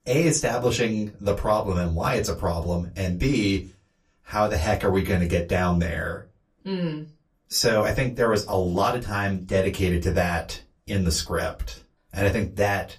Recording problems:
off-mic speech; far
room echo; very slight; dies away in 0.2 s

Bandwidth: 14.5 kHz